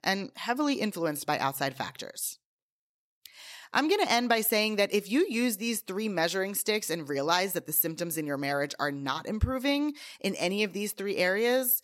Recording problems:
none

